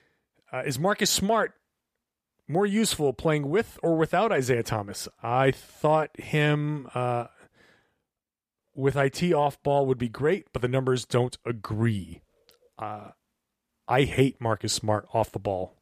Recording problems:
none

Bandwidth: 14.5 kHz